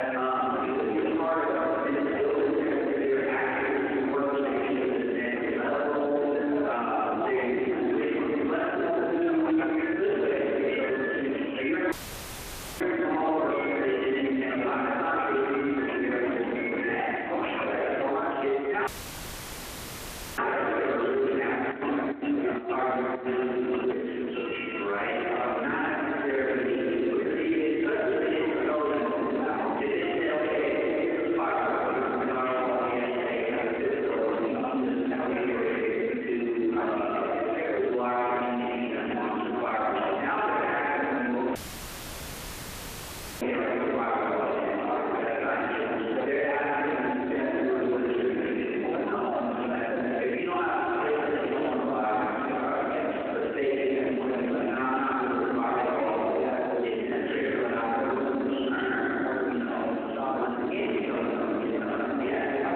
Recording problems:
room echo; strong; dies away in 2.7 s
off-mic speech; far
phone-call audio
squashed, flat; somewhat
background chatter; loud; throughout; 2 voices, 7 dB below the speech
doorbell; noticeable; from 8.5 to 18 s; peak 4 dB below the speech
audio cutting out; filled with static; at 12 s for 1 s, at 19 s for 1.5 s and at 42 s for 2 s
alarm; noticeable; from 21 to 26 s; peak 9 dB below the speech

